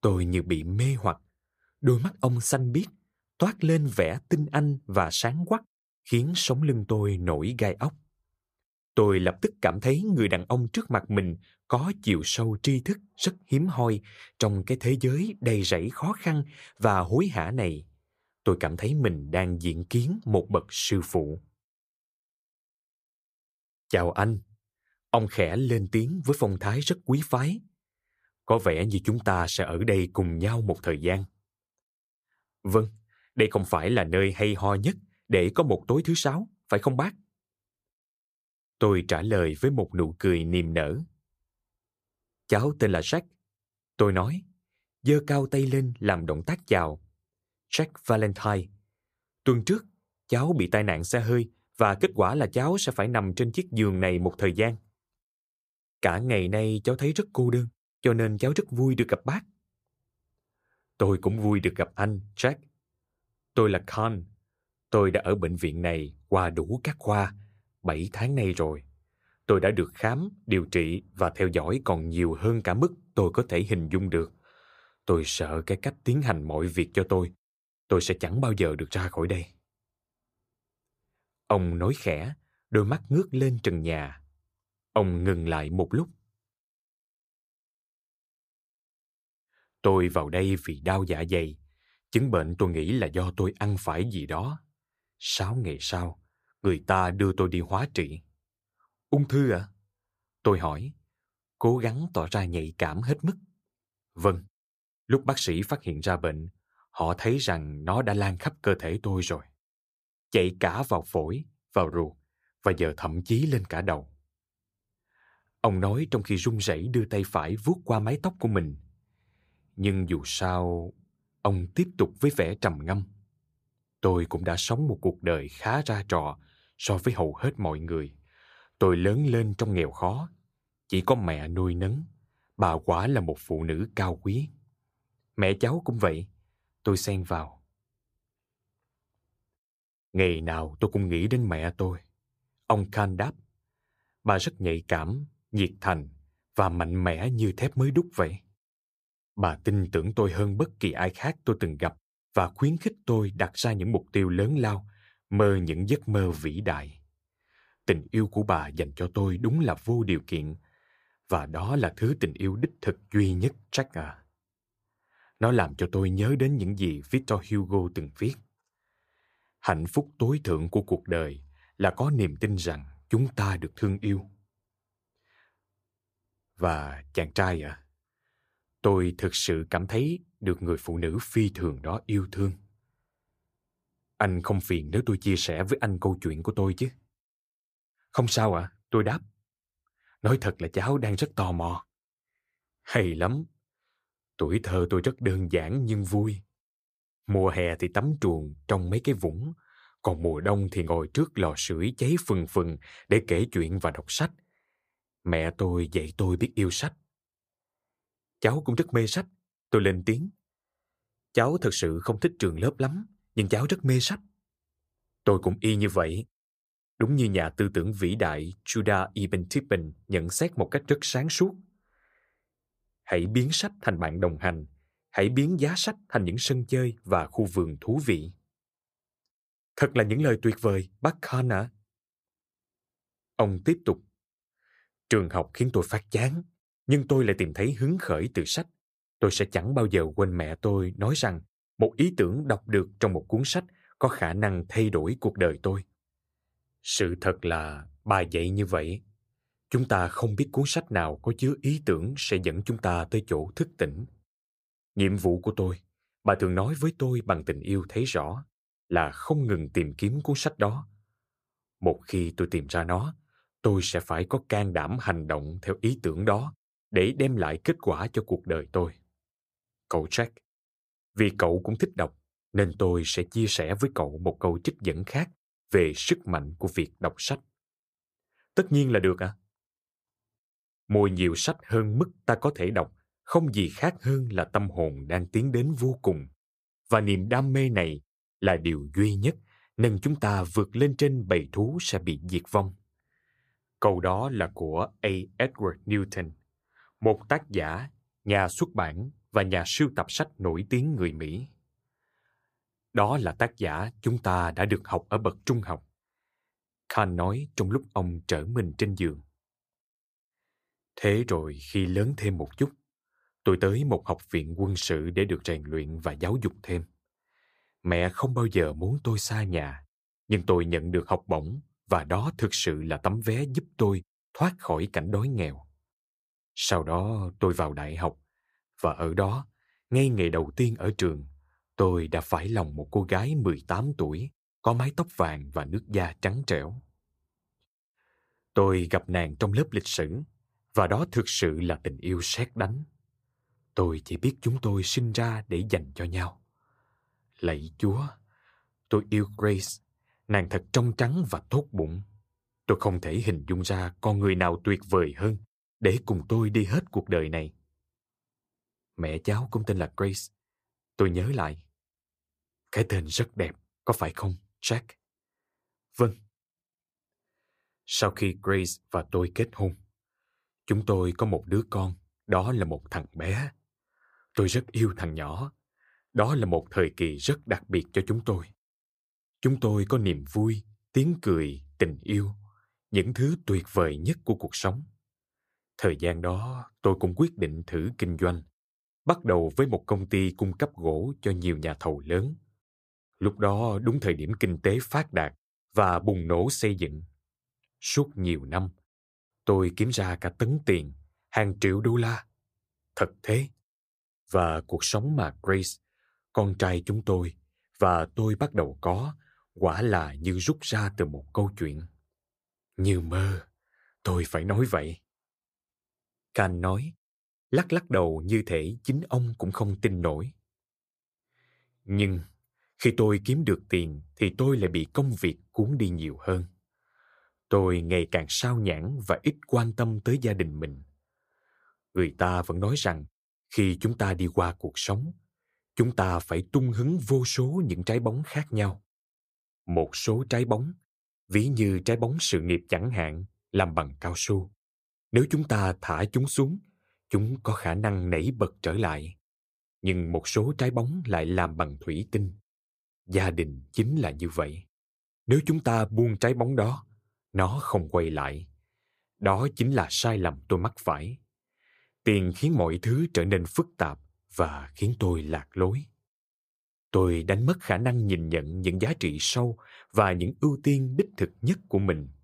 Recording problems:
none

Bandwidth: 15 kHz